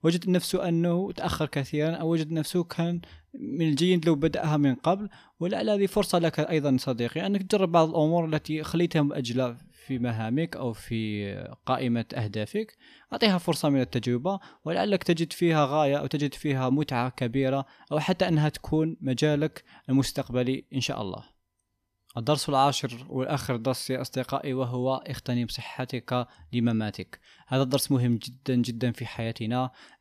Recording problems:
none

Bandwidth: 14.5 kHz